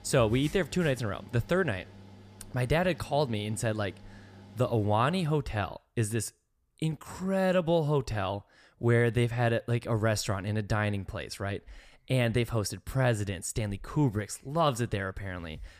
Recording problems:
machinery noise; faint; until 5.5 s; 20 dB below the speech

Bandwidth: 15 kHz